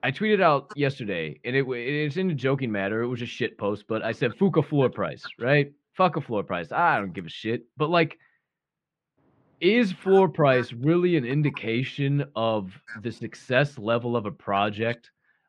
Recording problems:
muffled; very; fading above 2 kHz

